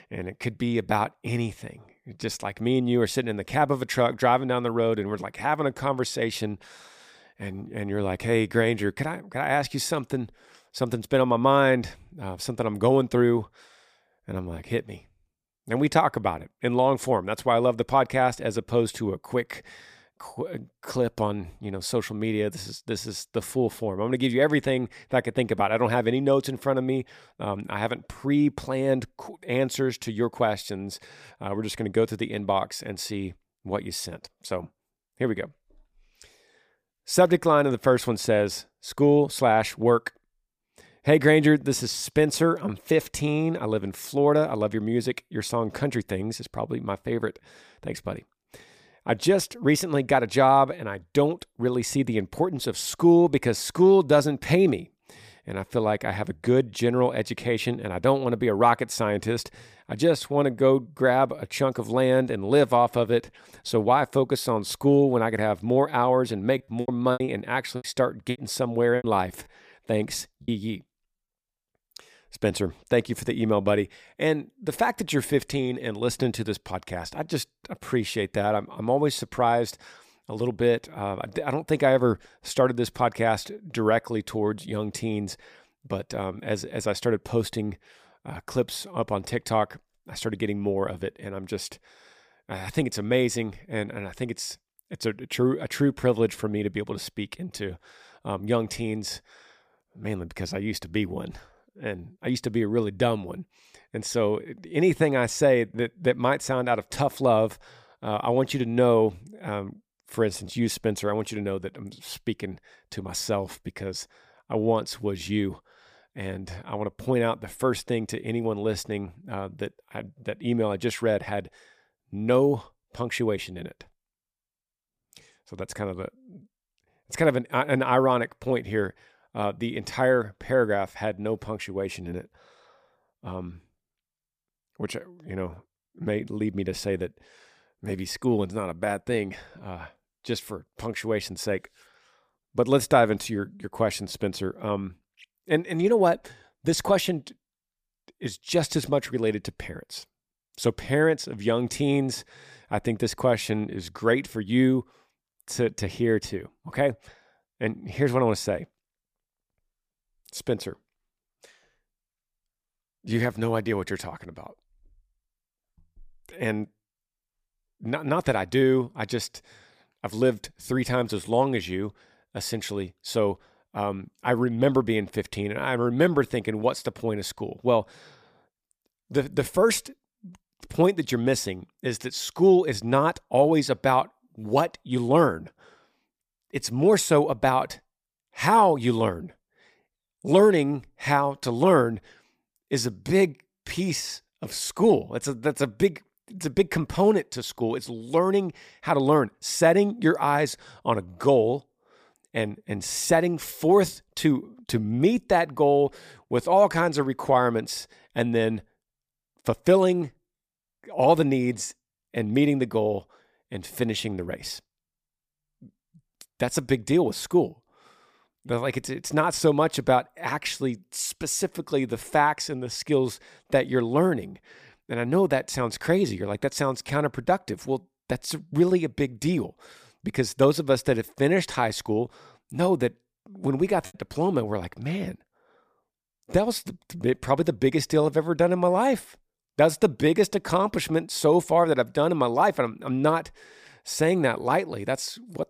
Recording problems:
choppy; very; from 1:07 to 1:10 and at 3:54; 12% of the speech affected

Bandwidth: 15 kHz